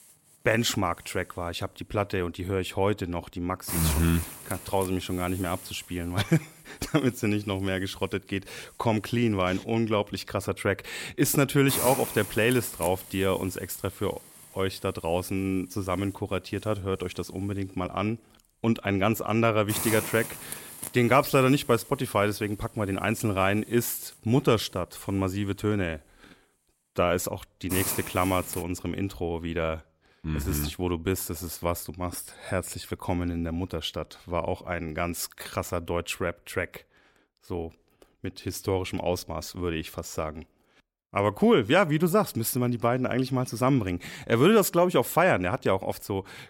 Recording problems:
hiss; loud; until 29 s; 8 dB below the speech

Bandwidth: 16.5 kHz